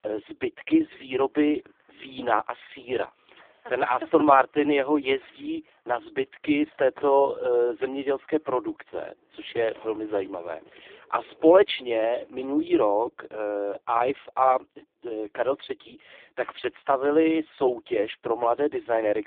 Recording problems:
phone-call audio; poor line
traffic noise; faint; until 15 s; 30 dB below the speech

